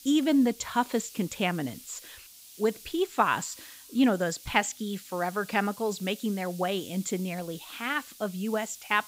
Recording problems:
high frequencies cut off; noticeable; nothing above 8 kHz
hiss; noticeable; throughout; 15 dB below the speech

